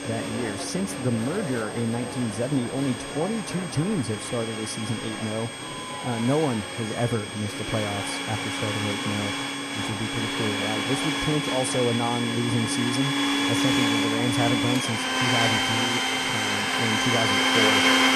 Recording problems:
household noises; very loud; throughout; 4 dB above the speech
murmuring crowd; loud; throughout; 9 dB below the speech
high-pitched whine; noticeable; throughout; 8.5 kHz, 10 dB below the speech
animal sounds; noticeable; throughout; 20 dB below the speech

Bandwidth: 14.5 kHz